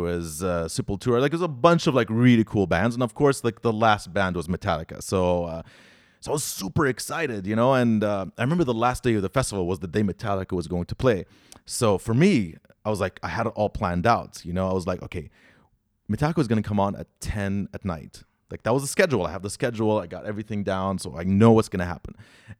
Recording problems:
abrupt cut into speech; at the start

